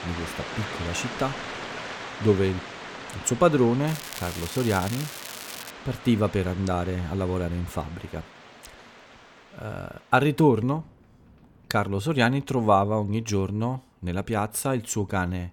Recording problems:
rain or running water; noticeable; throughout; 10 dB below the speech
crackling; noticeable; from 4 to 5.5 s; 10 dB below the speech

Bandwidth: 18 kHz